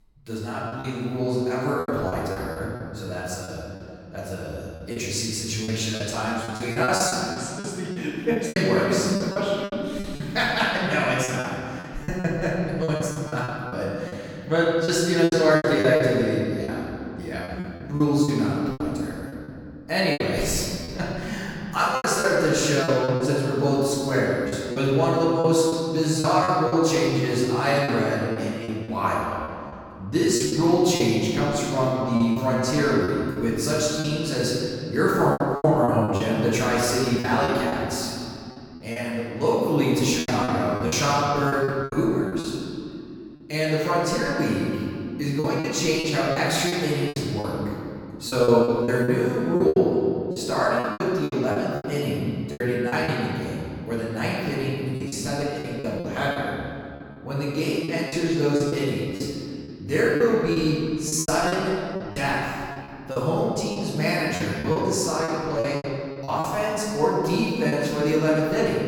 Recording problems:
room echo; strong; dies away in 2.5 s
off-mic speech; far
choppy; very; 11% of the speech affected

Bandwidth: 18 kHz